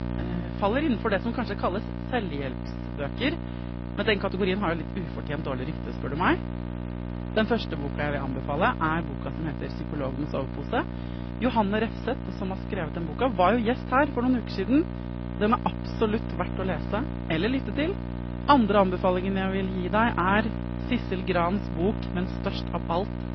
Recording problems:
garbled, watery; slightly; nothing above 5.5 kHz
high frequencies cut off; slight
electrical hum; noticeable; throughout; 60 Hz, 10 dB below the speech

